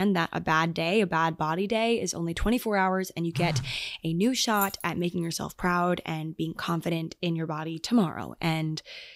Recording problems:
abrupt cut into speech; at the start
phone ringing; noticeable; at 3.5 s; peak 4 dB below the speech
jangling keys; noticeable; at 4.5 s; peak 7 dB below the speech

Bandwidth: 15.5 kHz